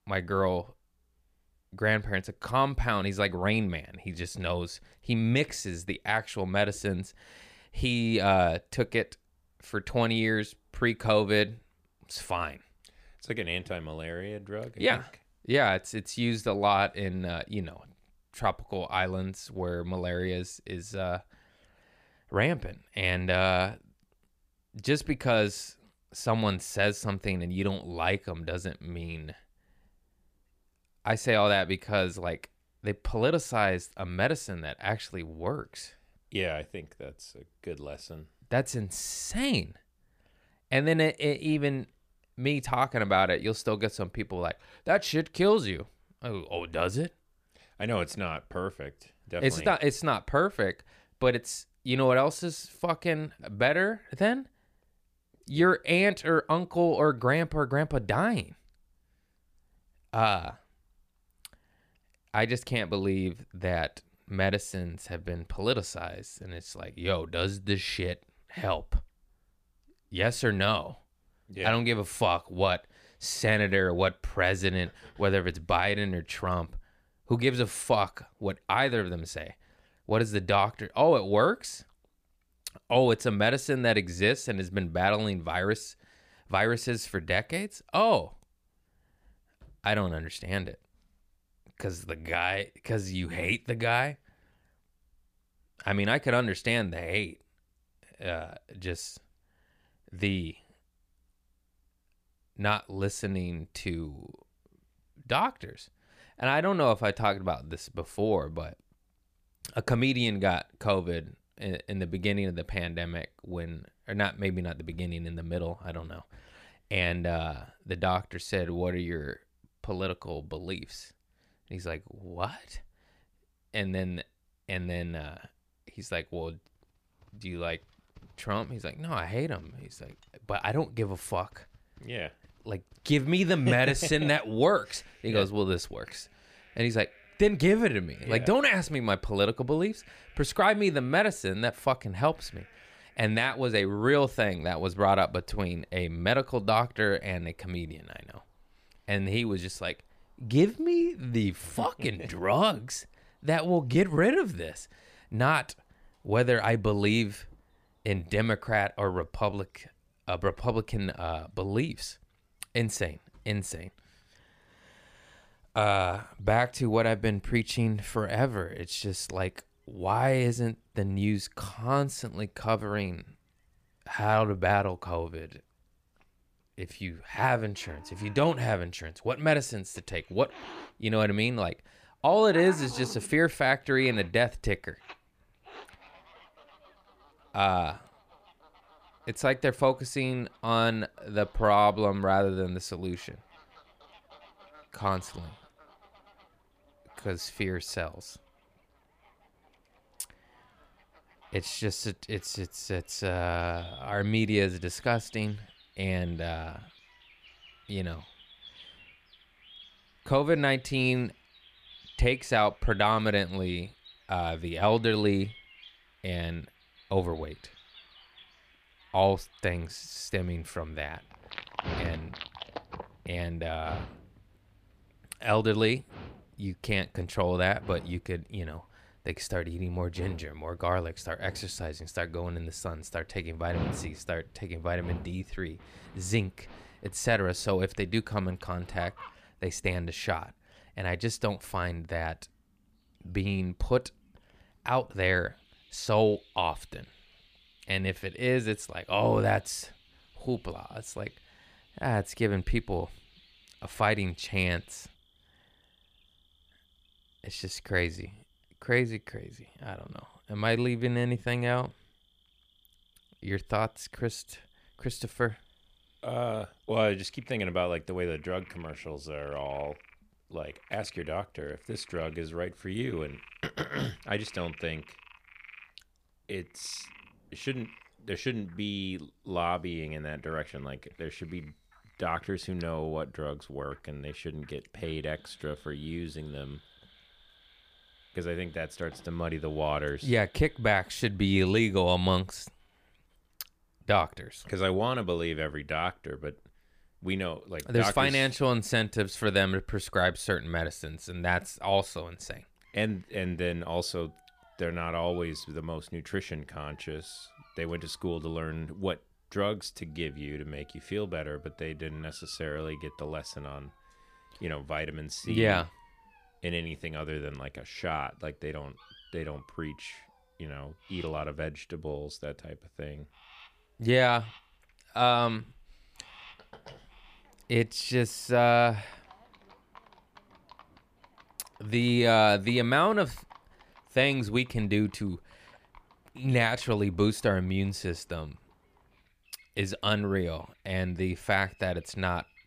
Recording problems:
animal sounds; faint; from 2:07 on; 20 dB below the speech

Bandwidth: 15 kHz